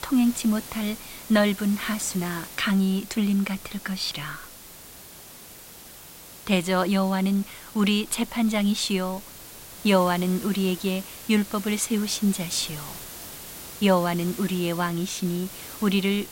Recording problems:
hiss; noticeable; throughout; 15 dB below the speech

